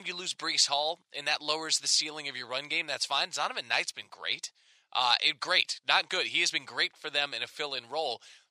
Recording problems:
thin; very; fading below 700 Hz
abrupt cut into speech; at the start

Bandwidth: 15 kHz